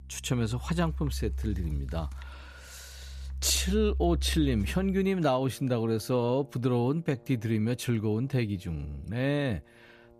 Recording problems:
background music; loud; throughout; 8 dB below the speech

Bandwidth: 14.5 kHz